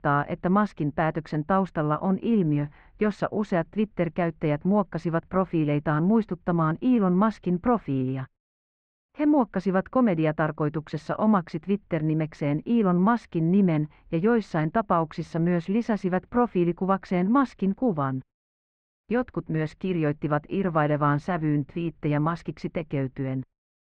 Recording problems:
muffled; very; fading above 2 kHz

